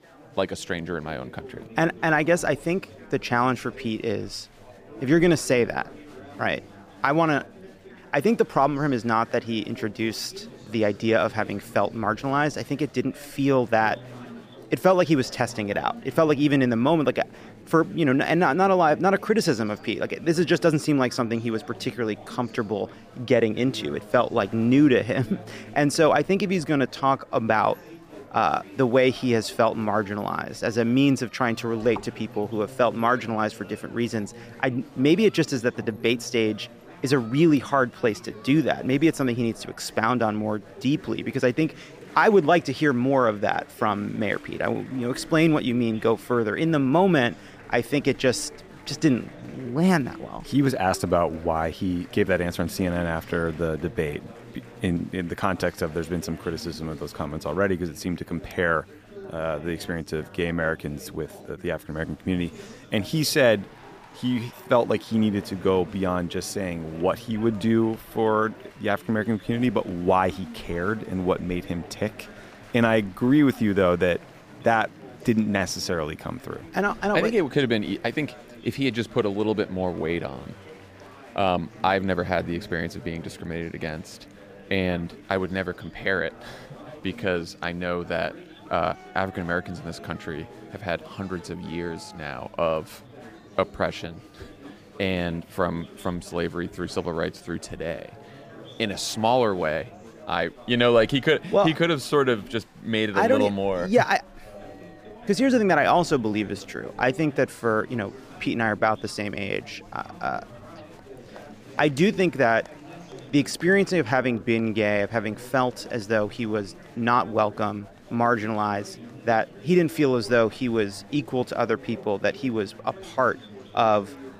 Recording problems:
chatter from many people; noticeable; throughout; 20 dB below the speech

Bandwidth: 15 kHz